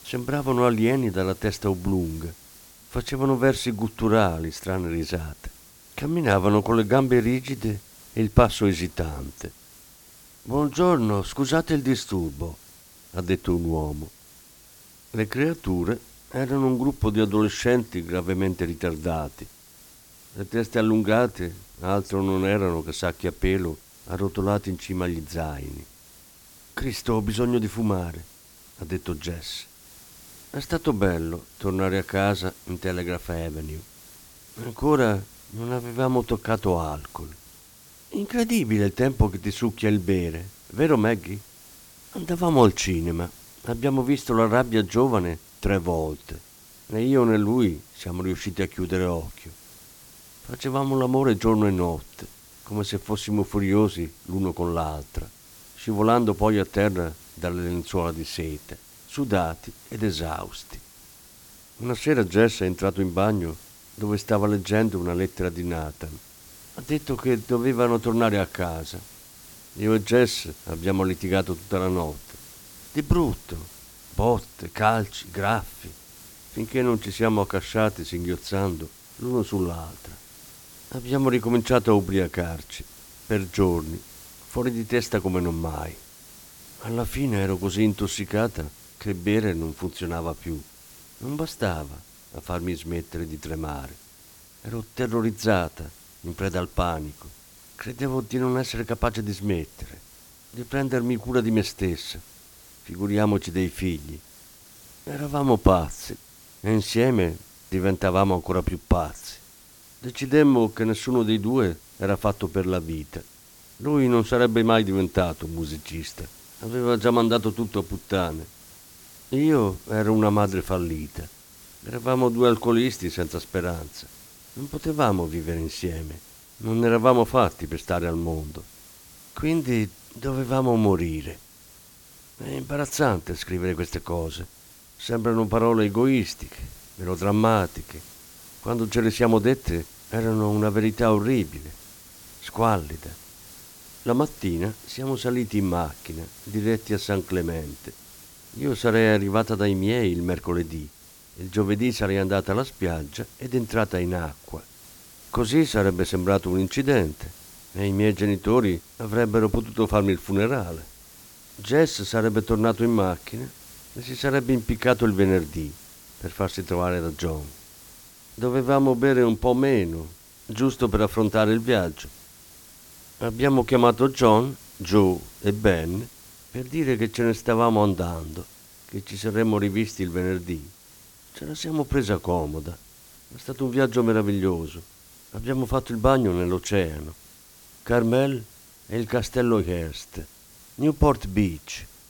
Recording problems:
hiss; faint; throughout; 20 dB below the speech

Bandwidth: 17.5 kHz